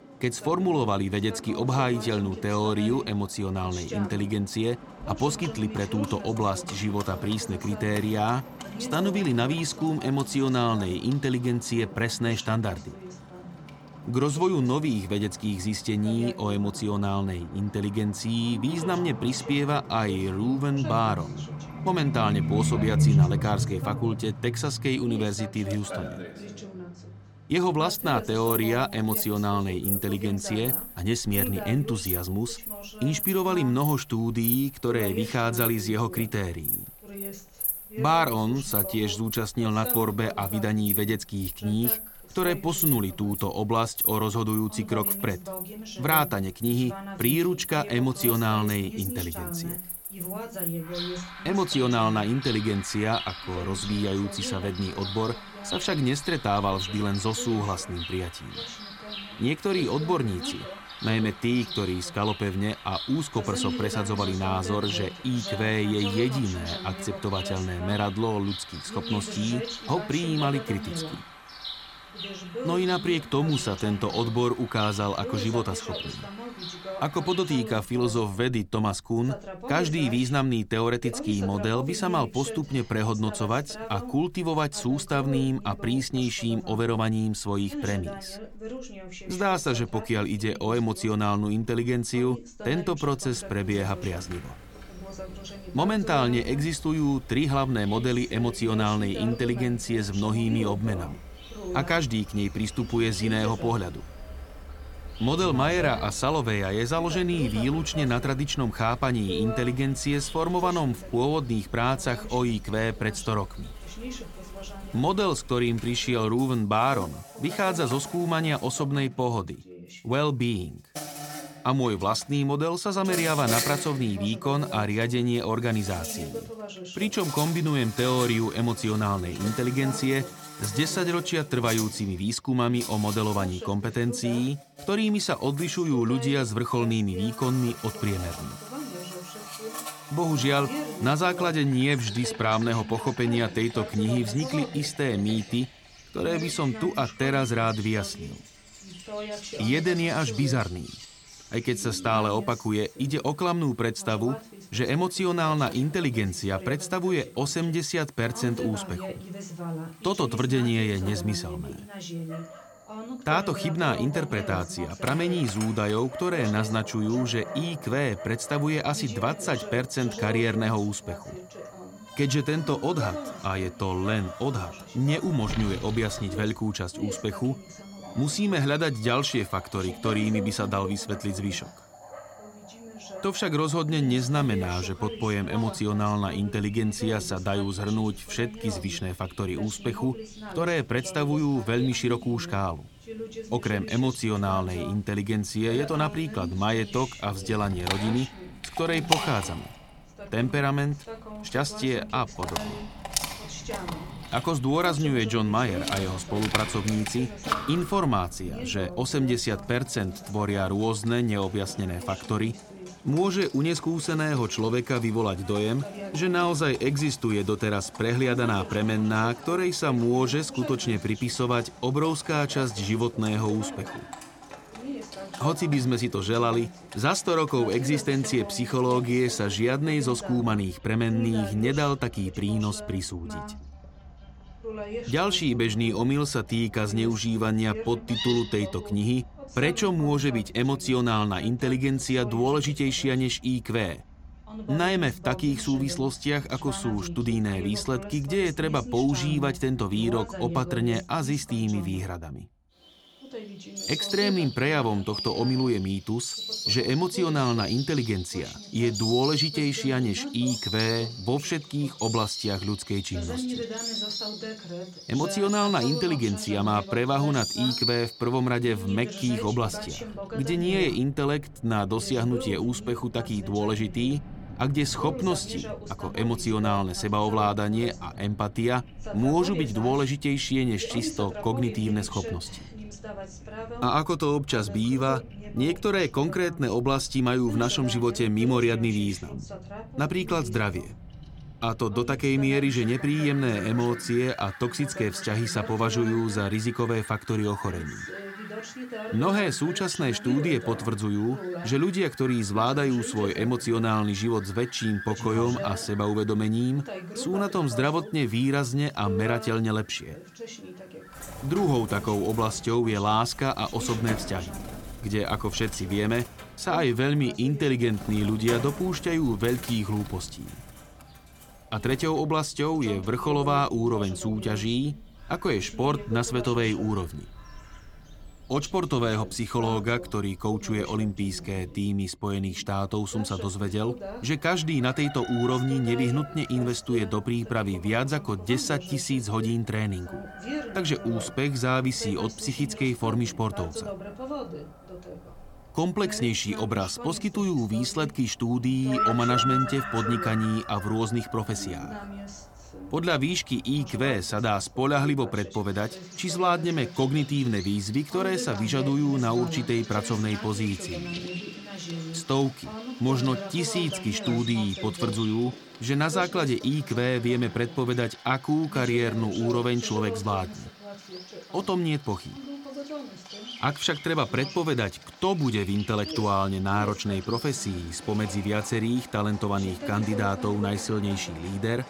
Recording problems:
animal sounds; loud; throughout; 10 dB below the speech
voice in the background; noticeable; throughout; 15 dB below the speech

